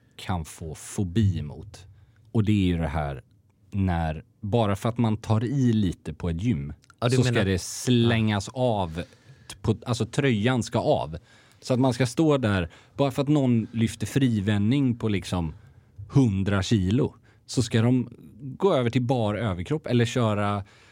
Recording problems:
none

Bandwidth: 16 kHz